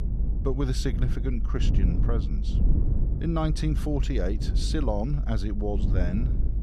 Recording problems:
low rumble; loud; throughout; 9 dB below the speech

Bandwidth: 14 kHz